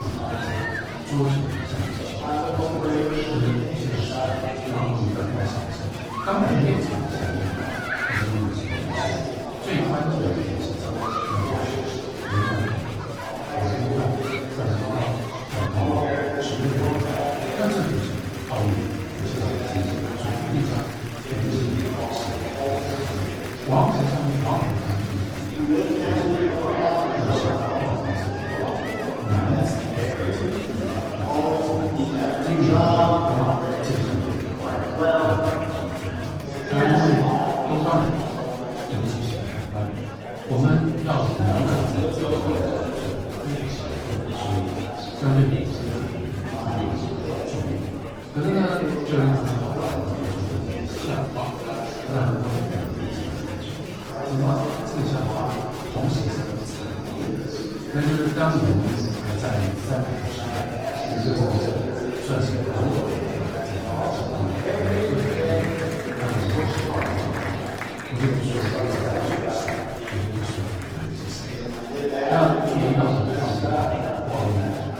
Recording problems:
off-mic speech; far
room echo; noticeable; dies away in 0.9 s
garbled, watery; slightly
murmuring crowd; loud; throughout; 1 dB below the speech
high-pitched whine; faint; until 39 s and from 50 s to 1:05; 4.5 kHz, 25 dB below the speech
abrupt cut into speech; at the start

